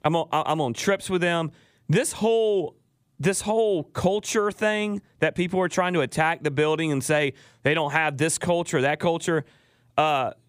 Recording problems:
squashed, flat; somewhat

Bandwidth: 15 kHz